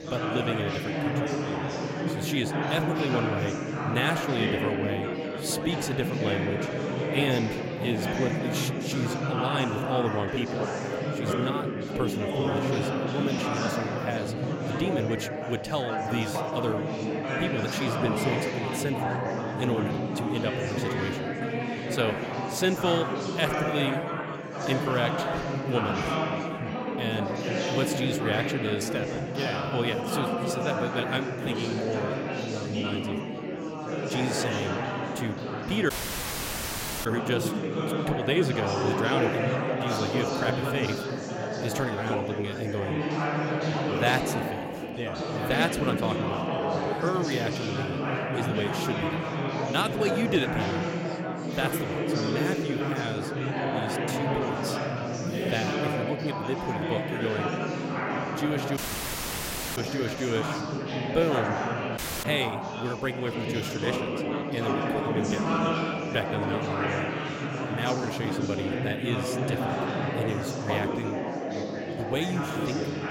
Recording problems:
chatter from many people; very loud; throughout; 2 dB above the speech
audio cutting out; at 36 s for 1 s, at 59 s for 1 s and at 1:02

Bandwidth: 16 kHz